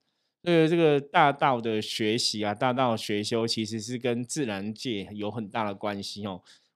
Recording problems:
none

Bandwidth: 15 kHz